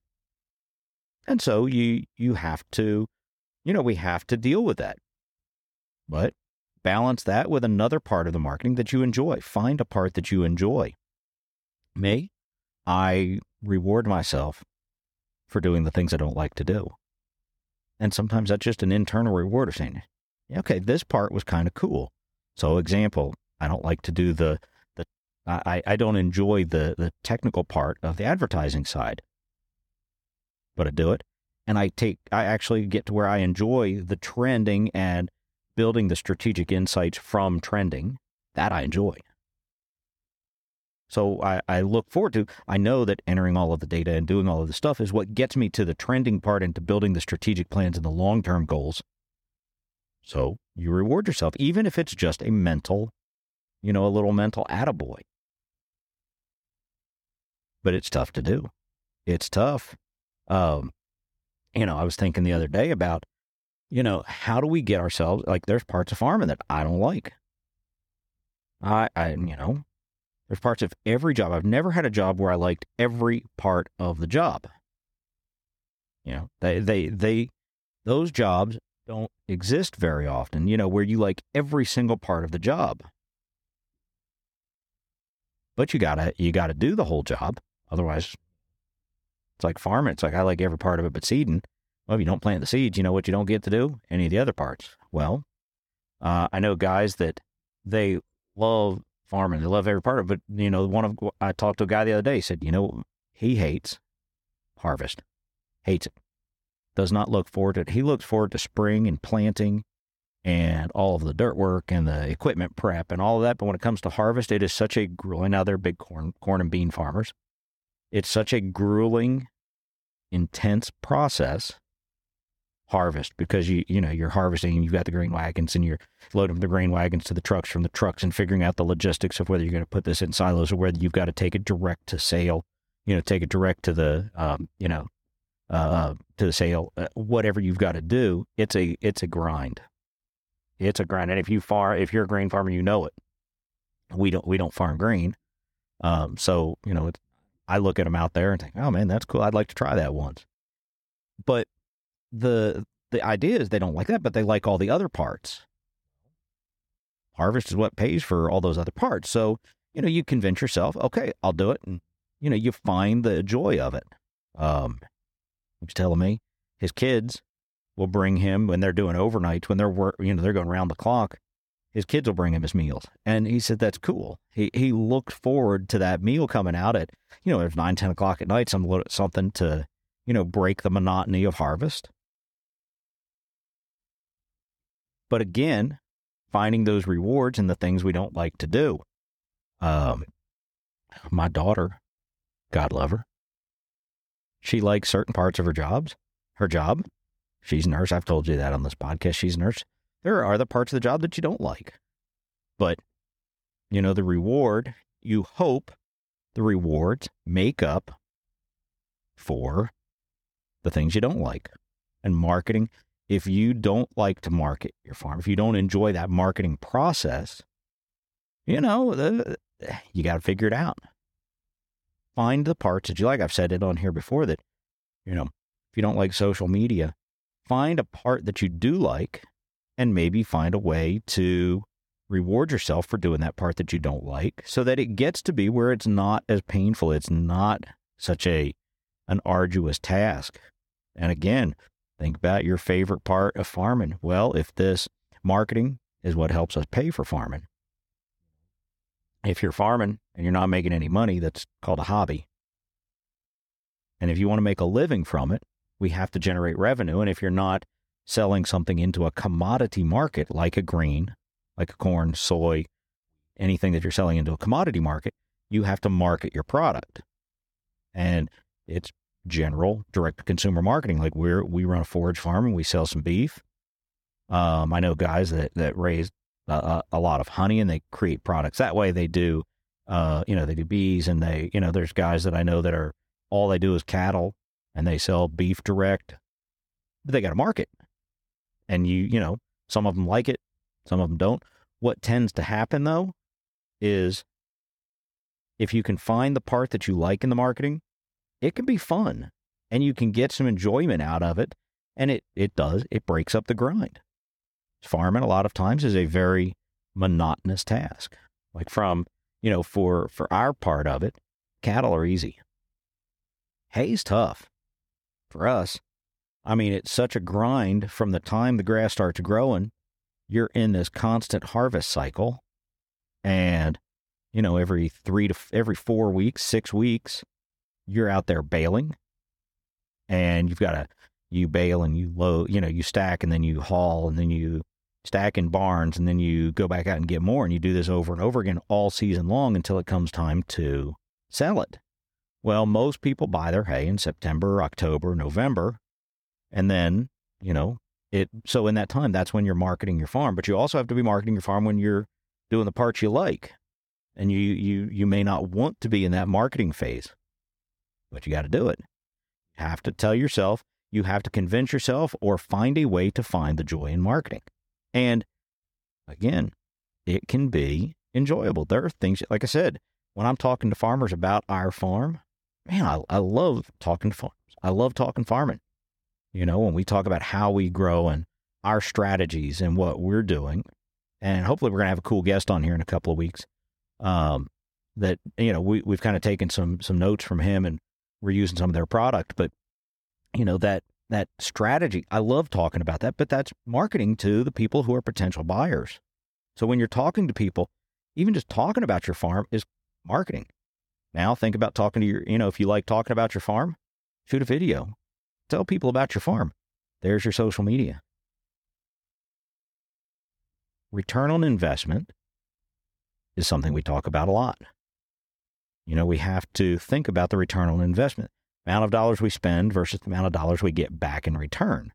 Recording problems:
none

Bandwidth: 17.5 kHz